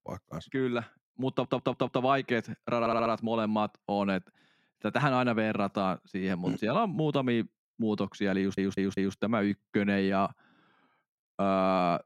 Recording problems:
audio stuttering; at 1.5 s, at 3 s and at 8.5 s

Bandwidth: 16 kHz